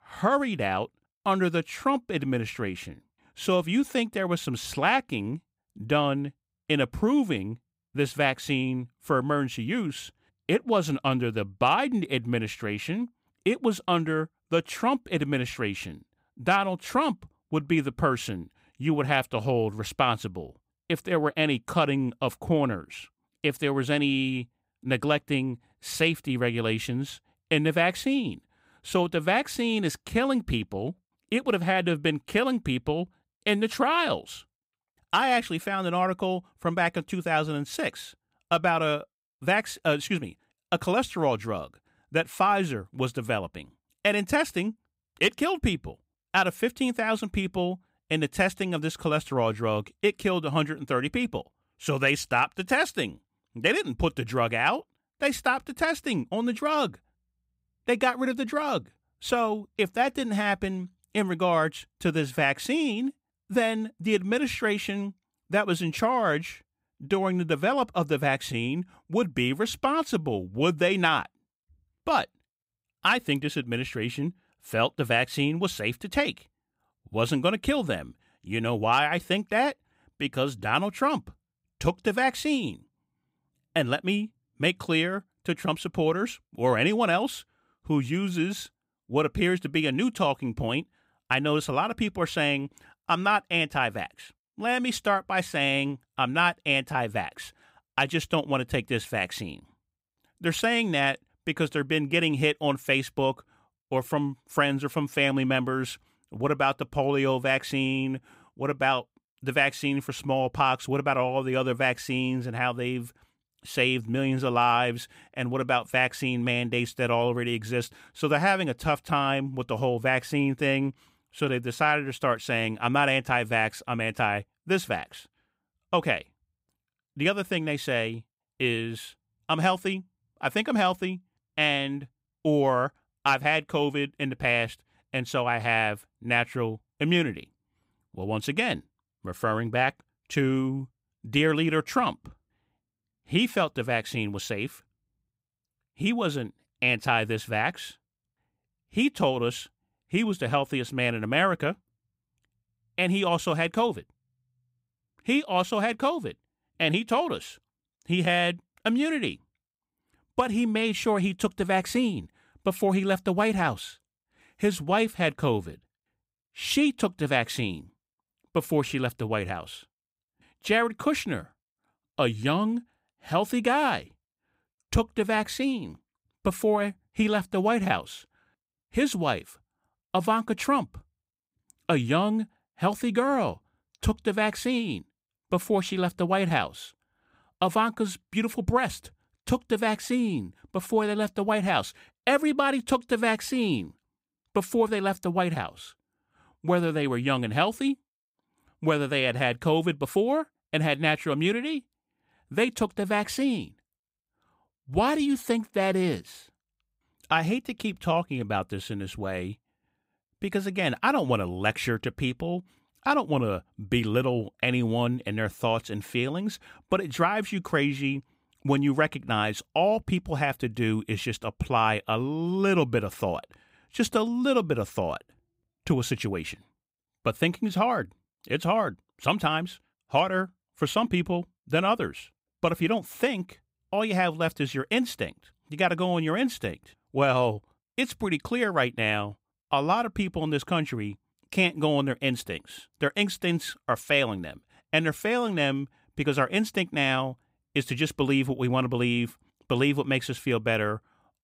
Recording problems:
none

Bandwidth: 15.5 kHz